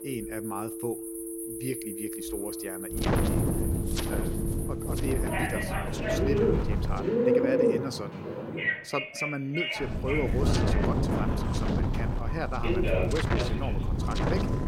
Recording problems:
alarms or sirens; very loud; throughout; 1 dB above the speech
animal sounds; very loud; until 8.5 s; 4 dB above the speech
wind noise on the microphone; heavy; from 3 to 7 s and from 10 s on; 1 dB above the speech
traffic noise; loud; from 10 s on; 7 dB below the speech
chatter from many people; faint; throughout; 25 dB below the speech

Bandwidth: 16 kHz